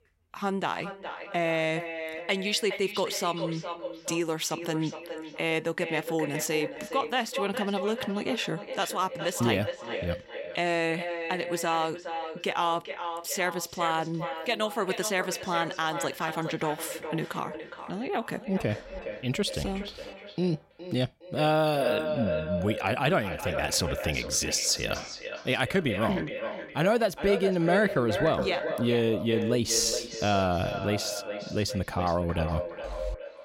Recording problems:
echo of what is said; strong; throughout; 410 ms later, 7 dB below the speech

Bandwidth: 16 kHz